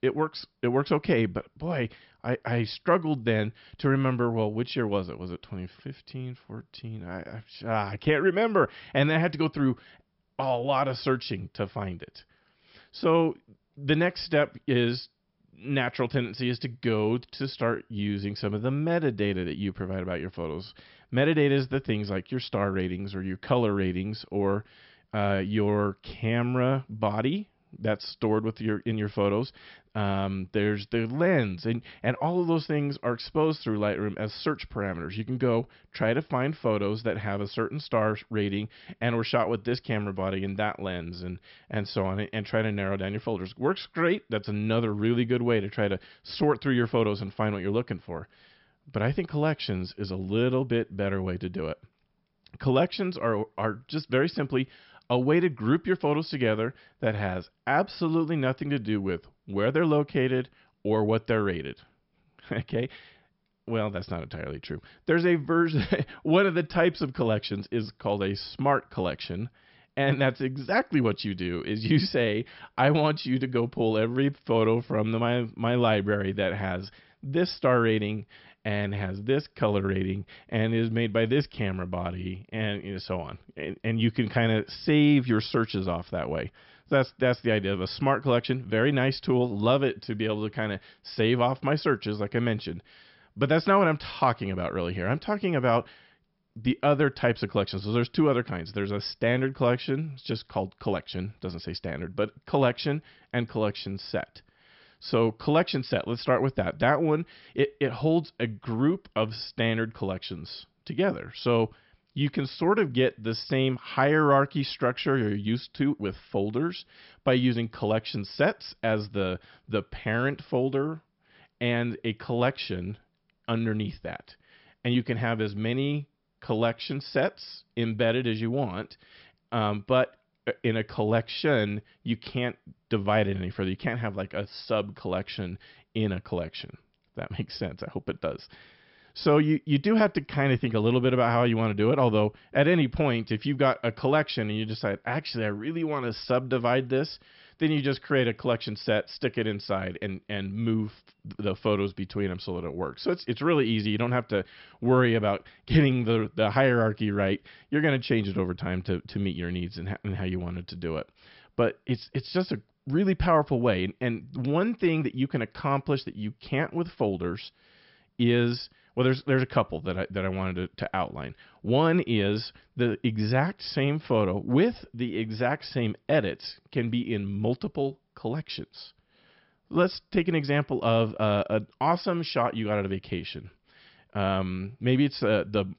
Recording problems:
high frequencies cut off; noticeable; nothing above 5.5 kHz

